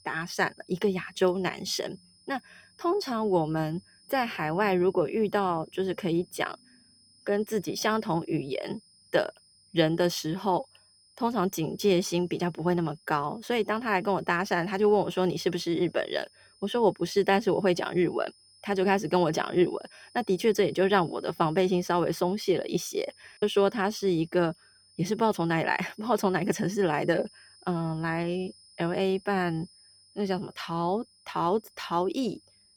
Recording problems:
high-pitched whine; faint; throughout; 5 kHz, 30 dB below the speech

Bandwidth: 18.5 kHz